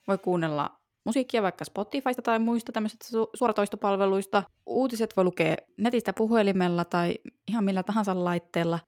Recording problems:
uneven, jittery; strongly; from 1 to 8 s

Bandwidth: 17 kHz